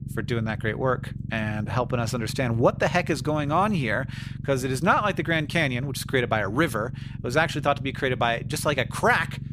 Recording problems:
low rumble; faint; throughout; 20 dB below the speech

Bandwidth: 15 kHz